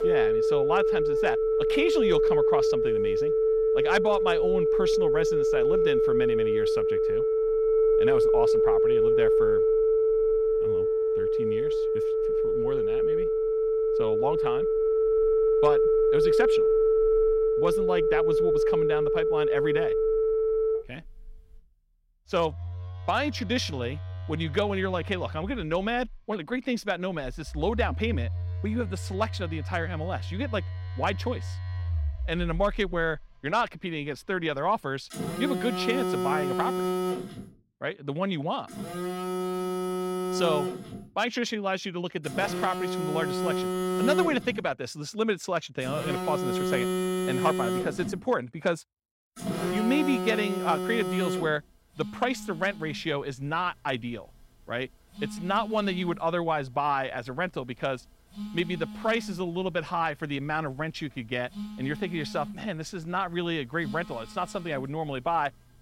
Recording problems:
alarms or sirens; very loud; throughout; 5 dB above the speech

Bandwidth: 16 kHz